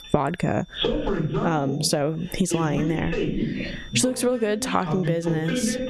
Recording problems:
squashed, flat; heavily, background pumping
voice in the background; loud; throughout; 3 dB below the speech
high-pitched whine; faint; throughout; 3.5 kHz, 25 dB below the speech

